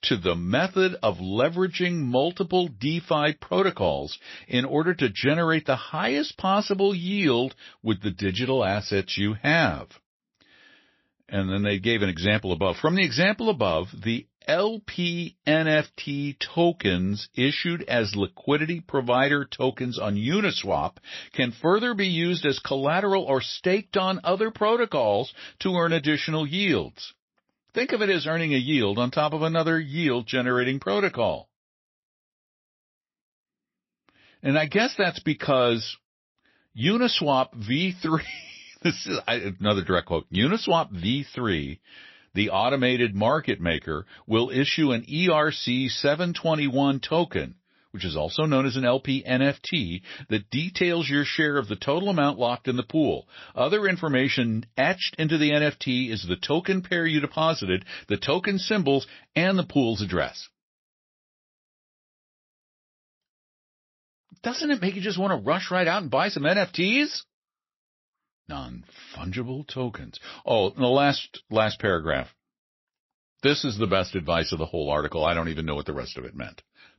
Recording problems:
garbled, watery; slightly; nothing above 5.5 kHz

